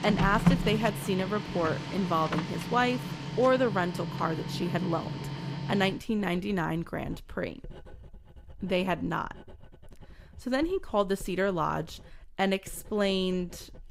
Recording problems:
household noises; loud; throughout; 4 dB below the speech

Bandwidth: 15.5 kHz